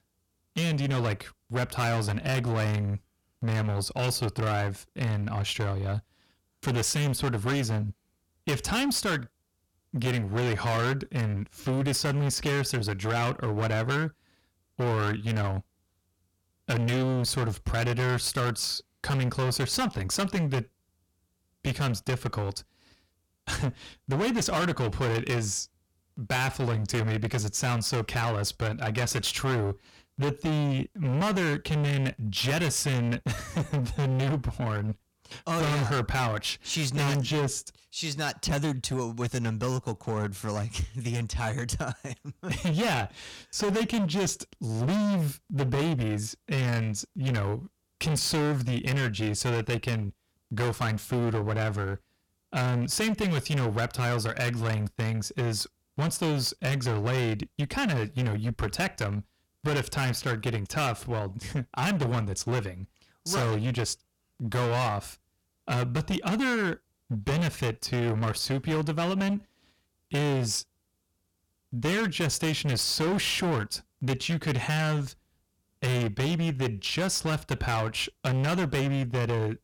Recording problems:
distortion; heavy; 22% of the sound clipped

